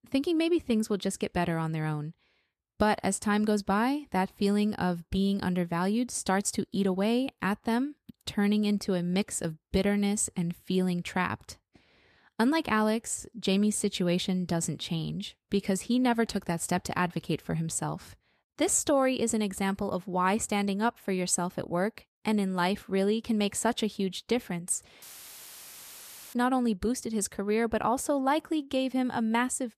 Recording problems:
audio cutting out; filled with static; at 25 s for 1.5 s

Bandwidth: 14 kHz